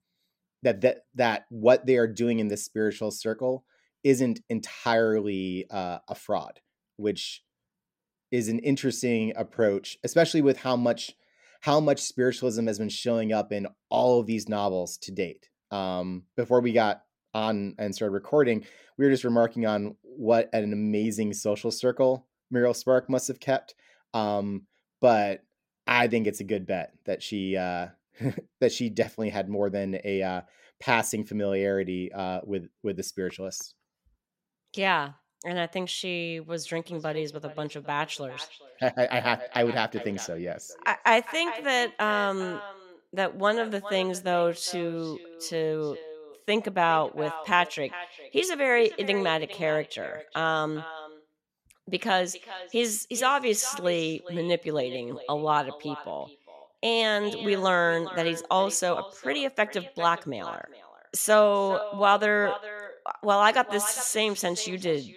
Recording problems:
echo of what is said; noticeable; from 37 s on; 410 ms later, 15 dB below the speech

